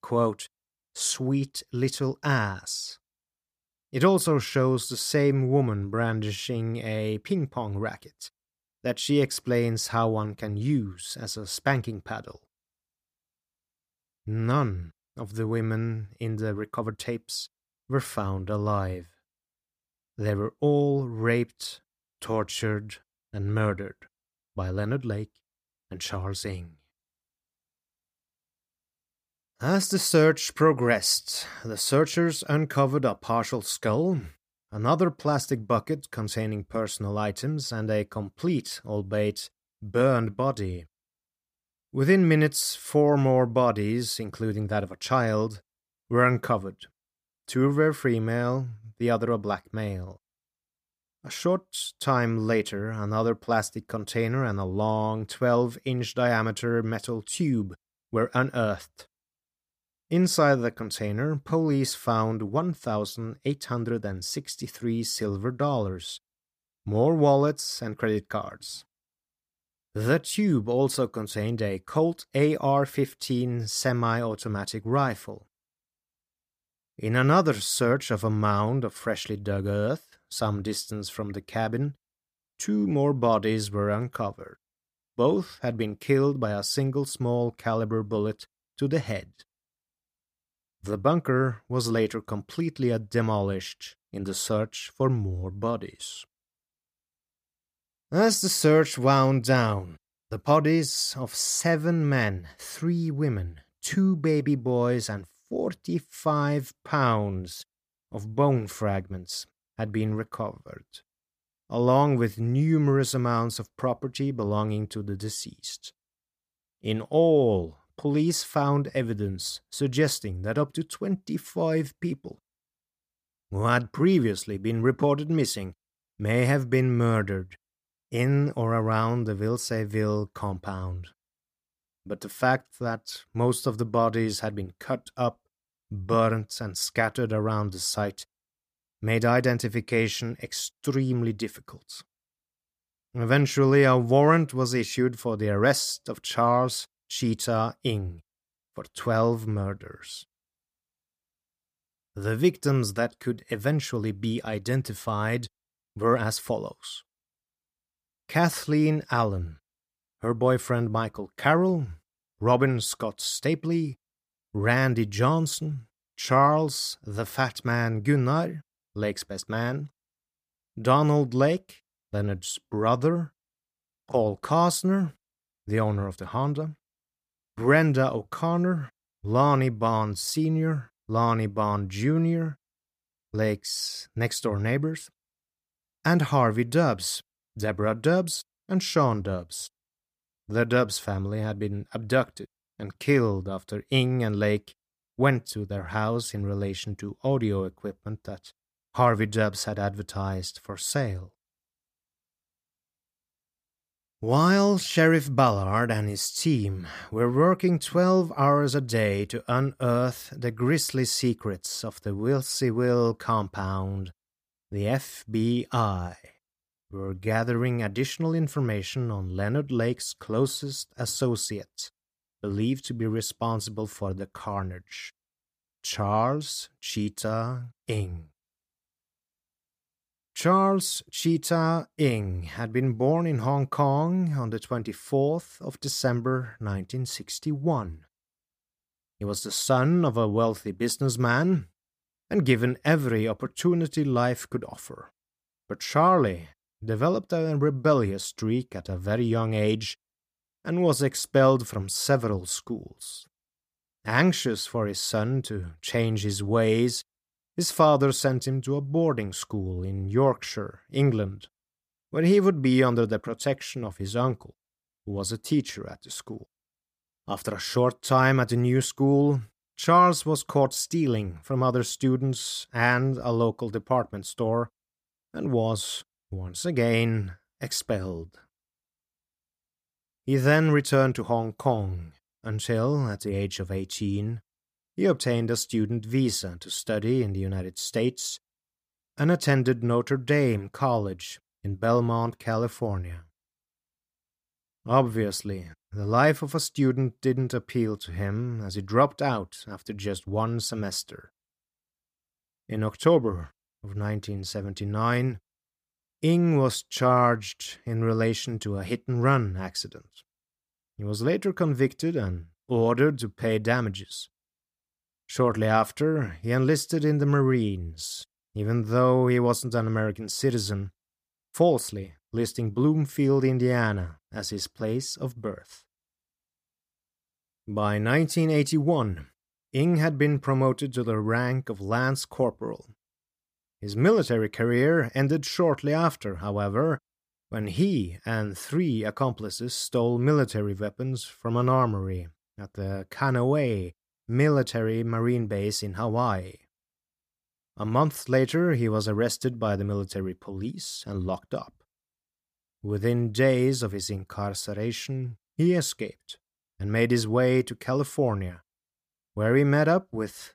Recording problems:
uneven, jittery; strongly; from 17 s to 5:51

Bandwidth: 15 kHz